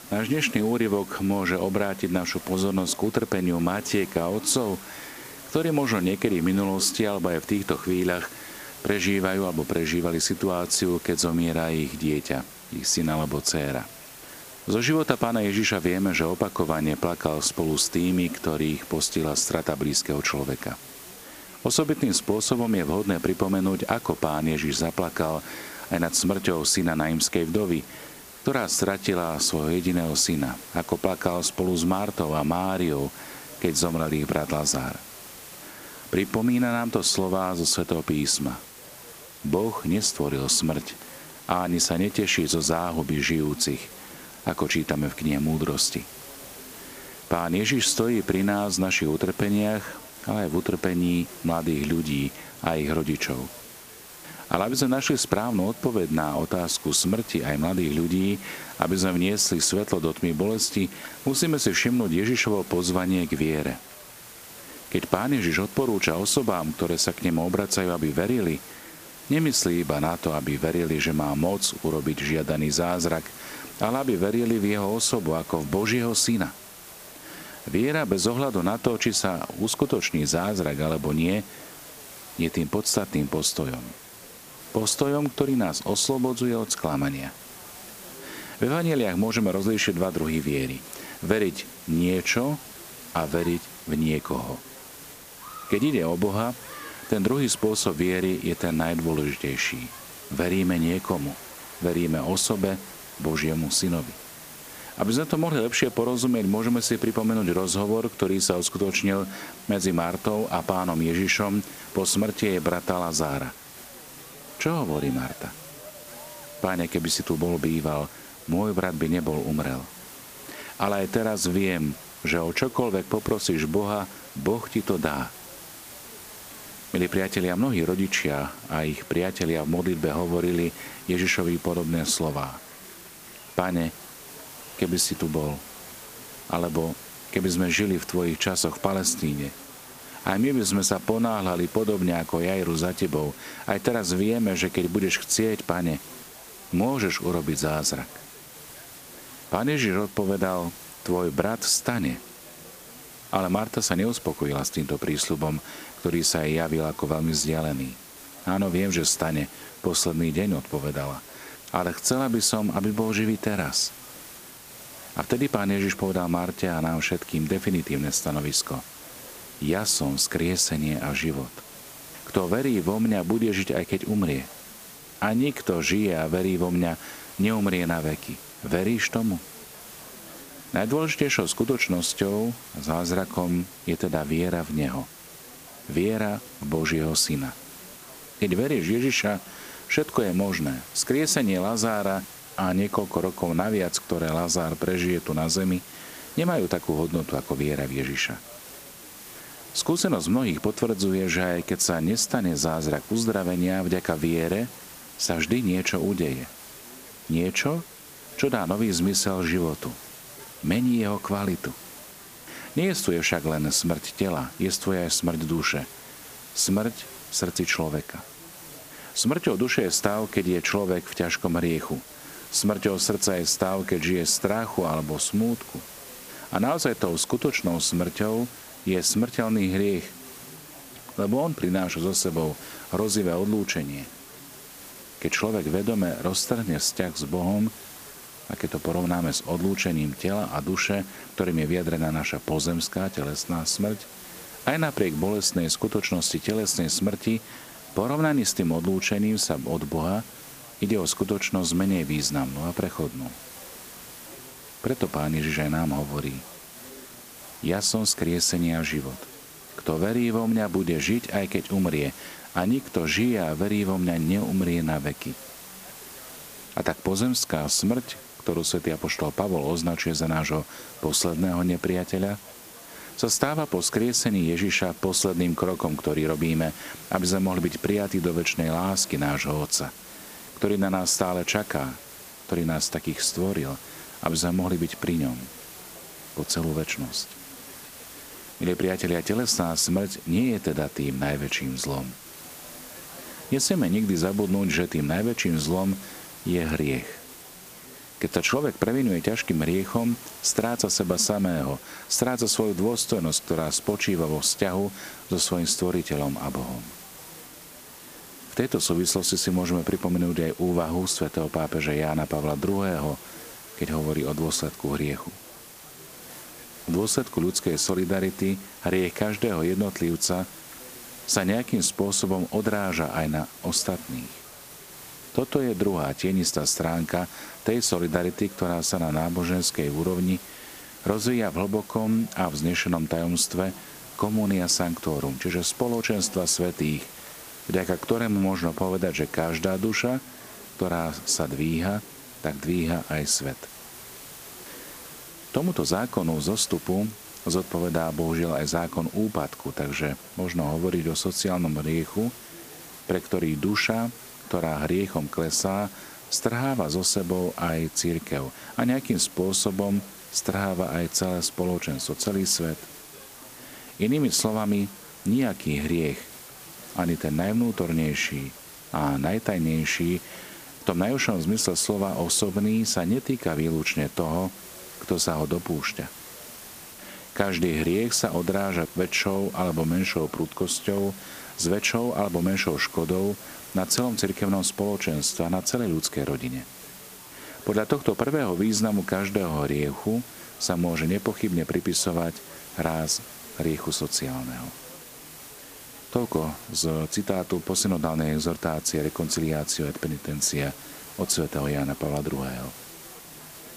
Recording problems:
hiss; noticeable; throughout; 15 dB below the speech
chatter from many people; faint; throughout; 25 dB below the speech

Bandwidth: 15 kHz